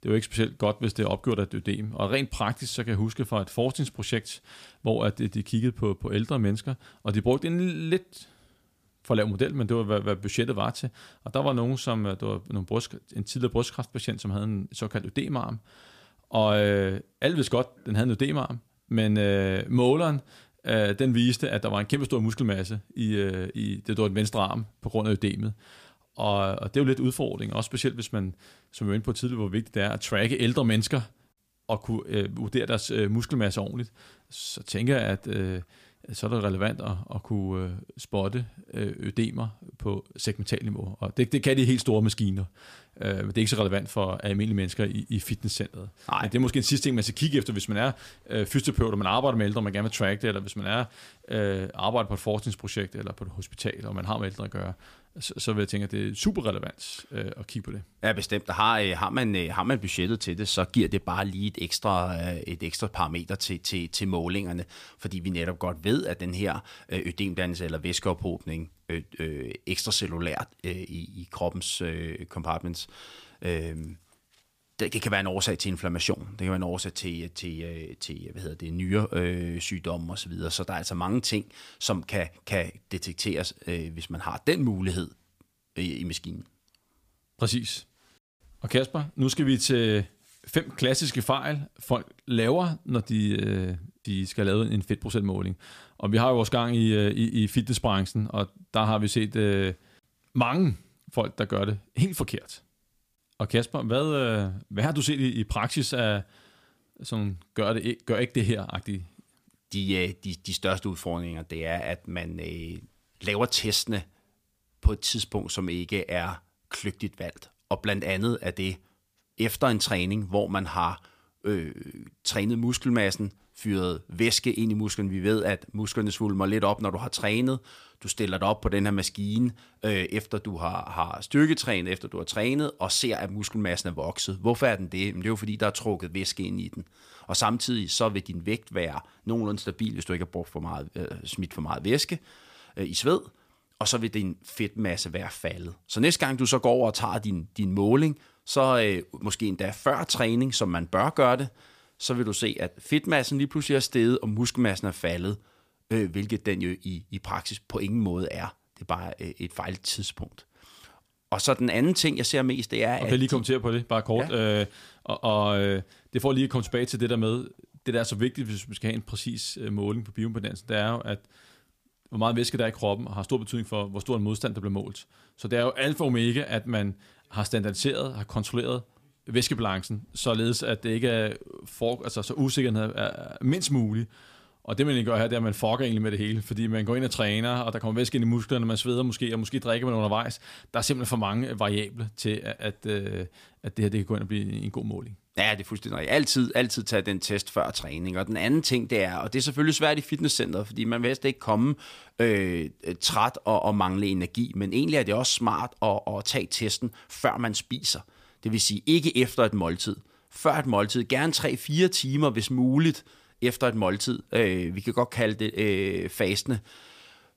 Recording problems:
none

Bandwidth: 15 kHz